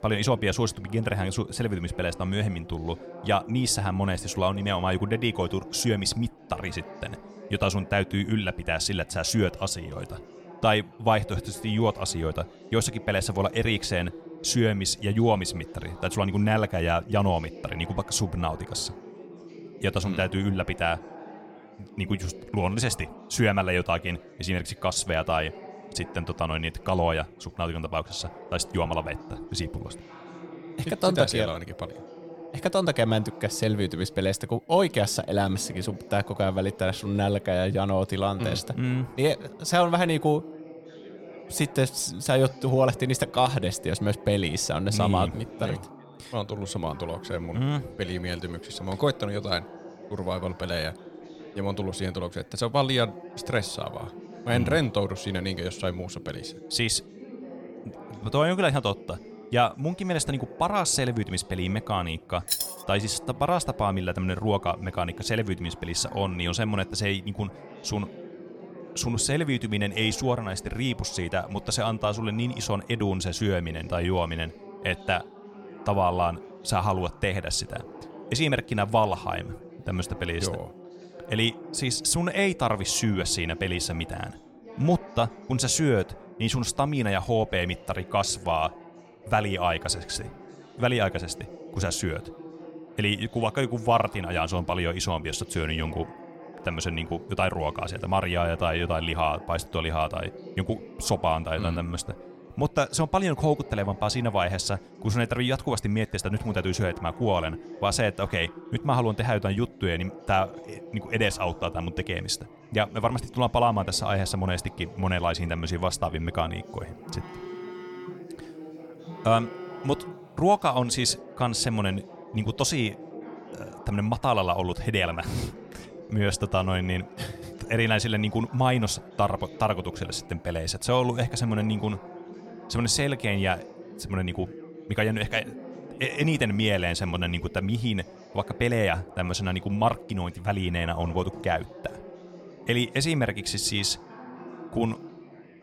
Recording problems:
chatter from many people; noticeable; throughout; 15 dB below the speech
jangling keys; loud; at 1:02; peak level with the speech
phone ringing; faint; from 1:57 to 2:00; peak 10 dB below the speech

